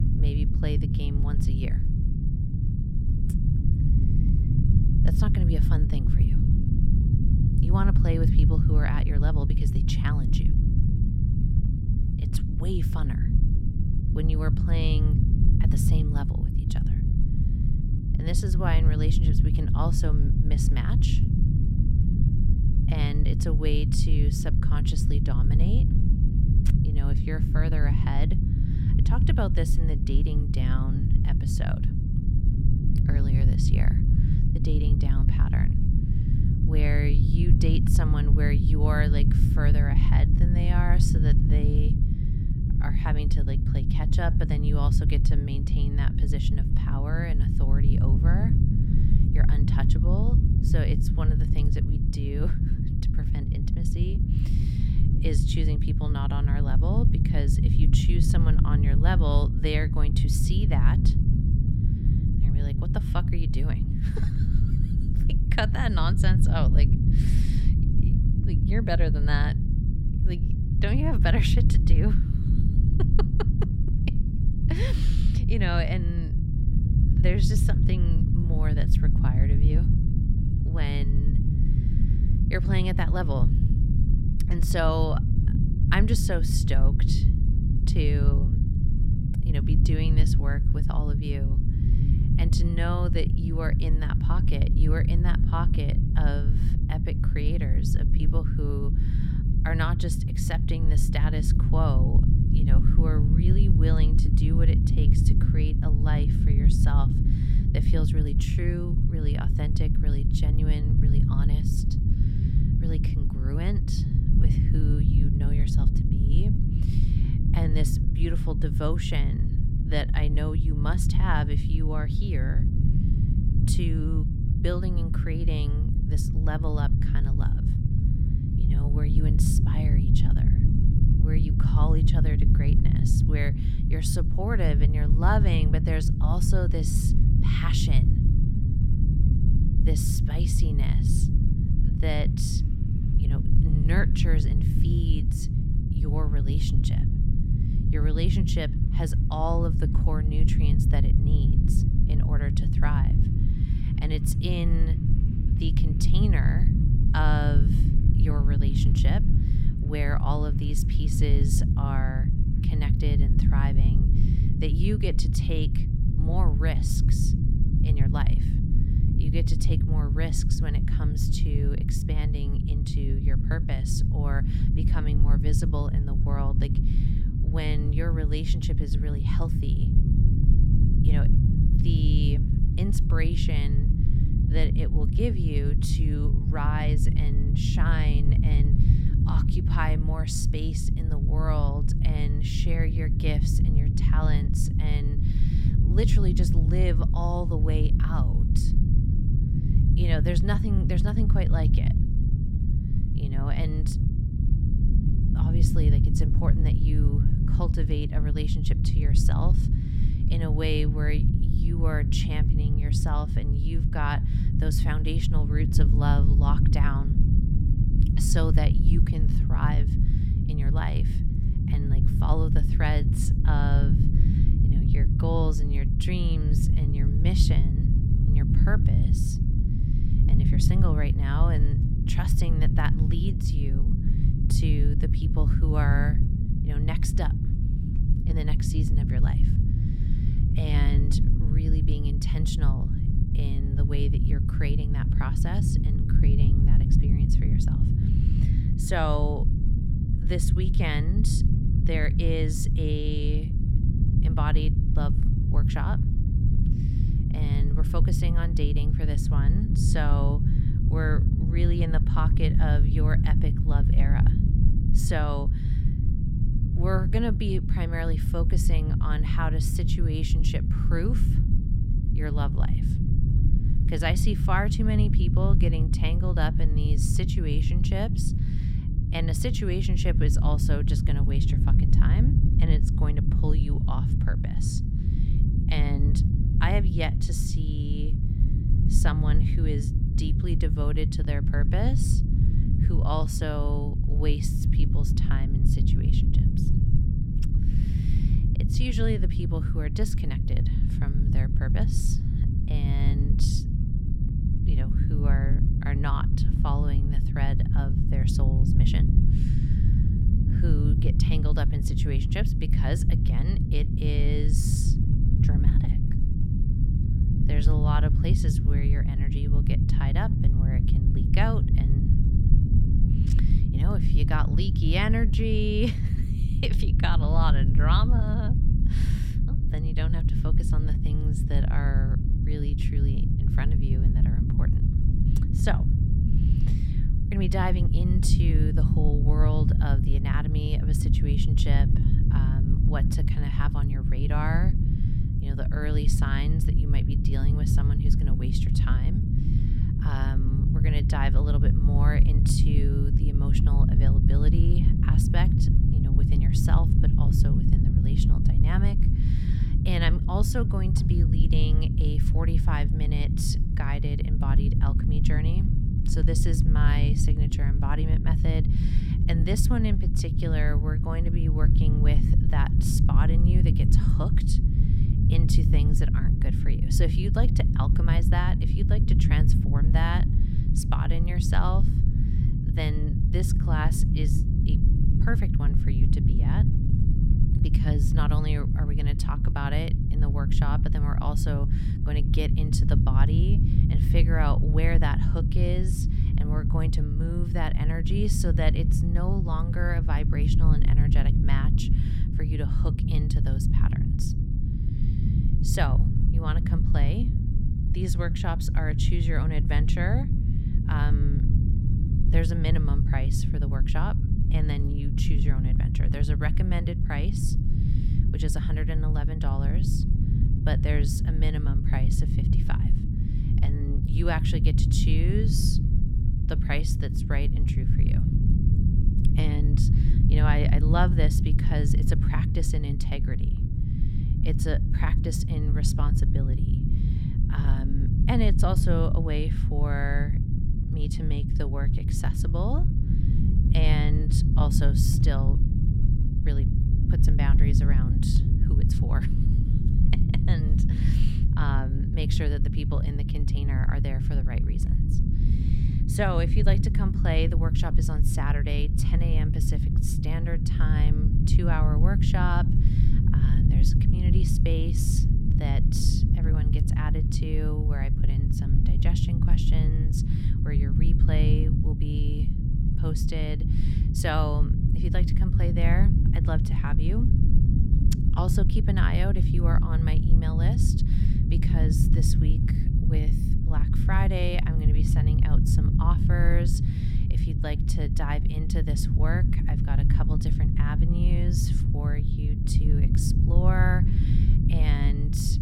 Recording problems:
low rumble; loud; throughout; 2 dB below the speech

